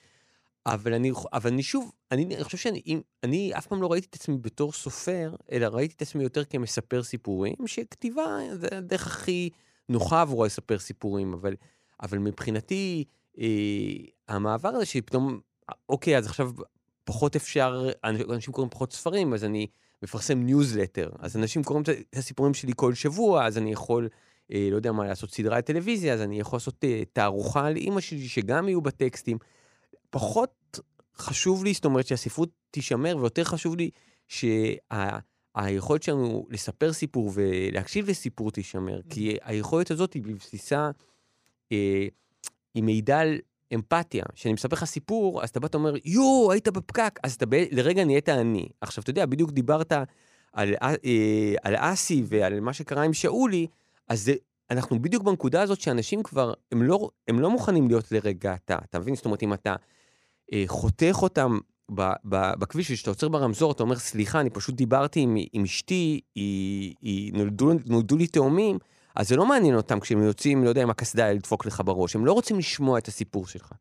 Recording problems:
none

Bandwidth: 15 kHz